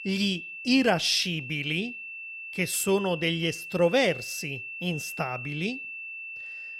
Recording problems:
high-pitched whine; loud; throughout; 2.5 kHz, 10 dB below the speech

